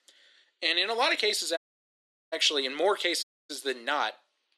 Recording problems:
thin; somewhat; fading below 300 Hz
audio cutting out; at 1.5 s for 0.5 s and at 3 s

